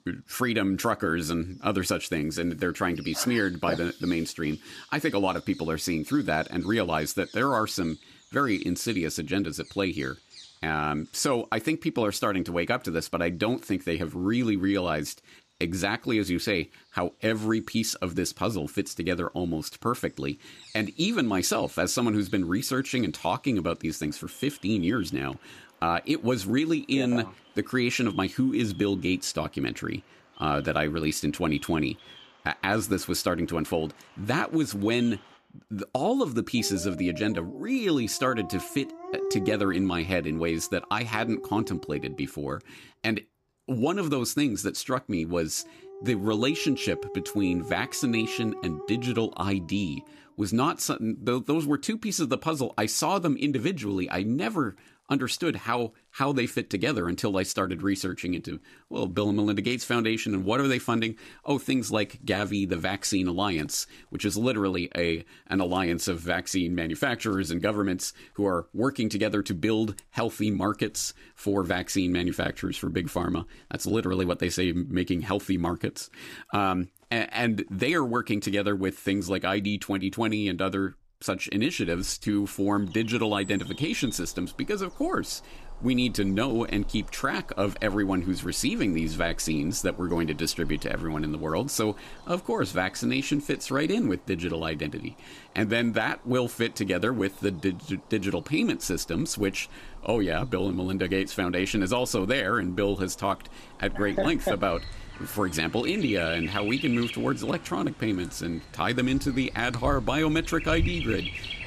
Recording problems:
animal sounds; noticeable; throughout; 15 dB below the speech

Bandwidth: 15 kHz